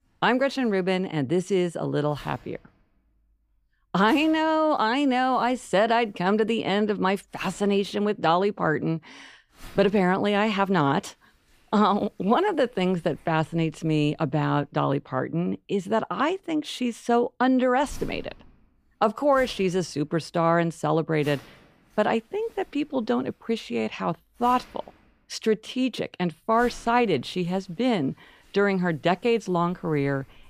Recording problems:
household noises; faint; throughout; 25 dB below the speech

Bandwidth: 15 kHz